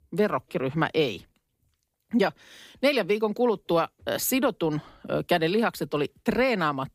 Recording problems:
none

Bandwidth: 15 kHz